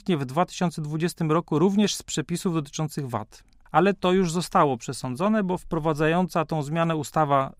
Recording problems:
none

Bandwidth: 15.5 kHz